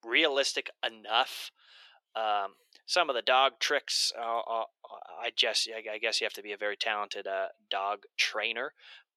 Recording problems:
thin; very; fading below 400 Hz

